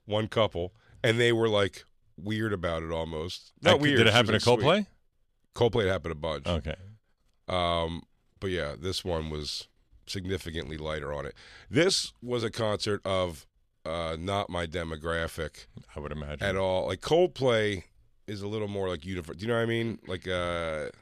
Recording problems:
none

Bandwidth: 14 kHz